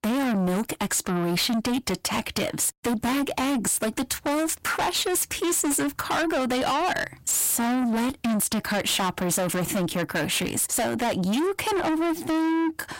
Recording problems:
distortion; heavy; 6 dB below the speech

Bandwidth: 16 kHz